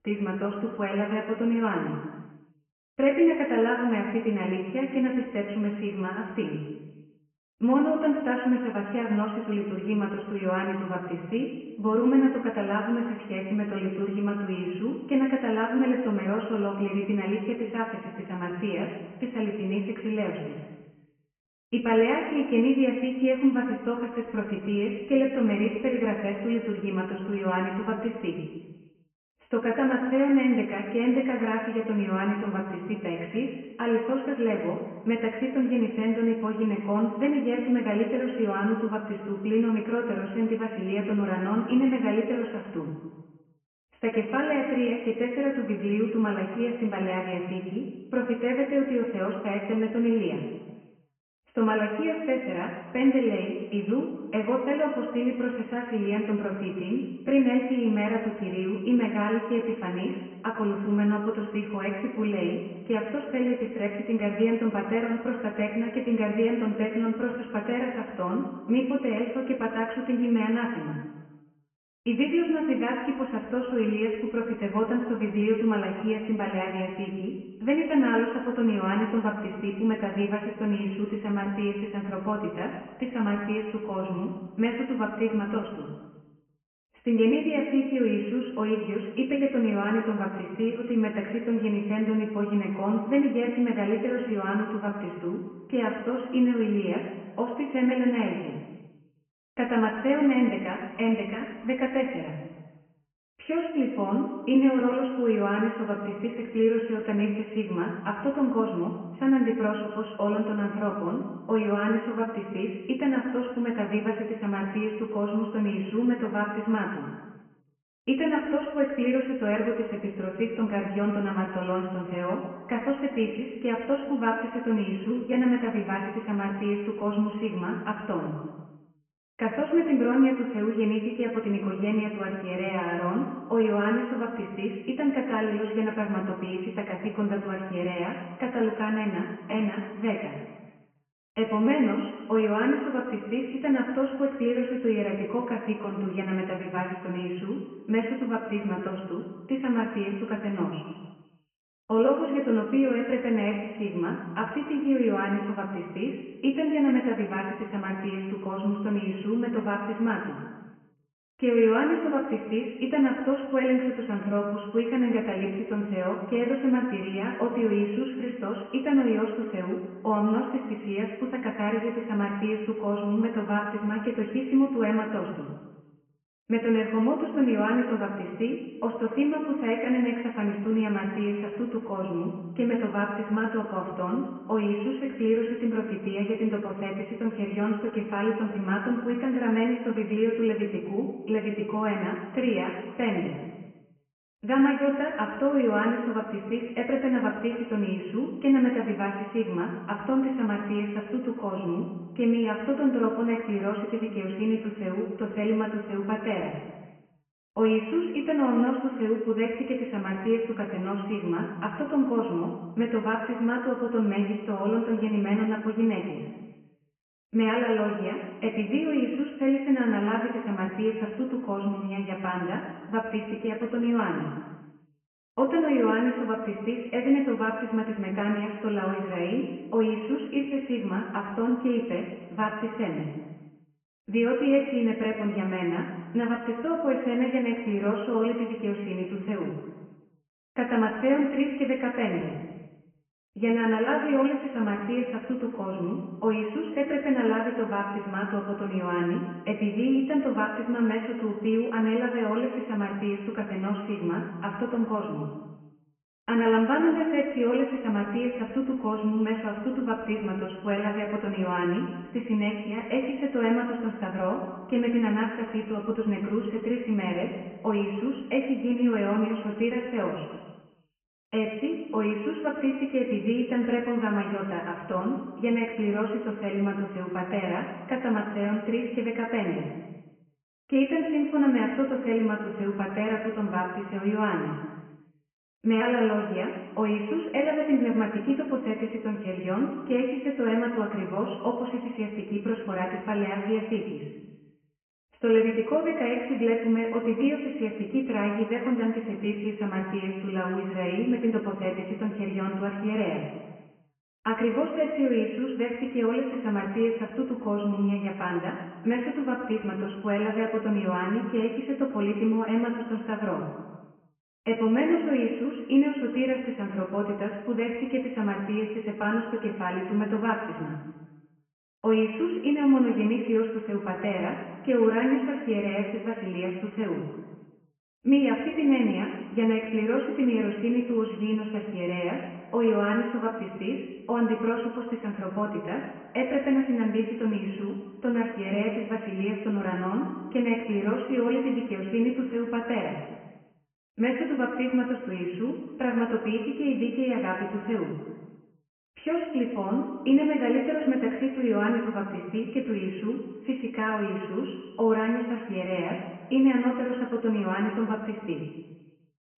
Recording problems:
off-mic speech; far
high frequencies cut off; severe; nothing above 3 kHz
room echo; noticeable; dies away in 1.3 s

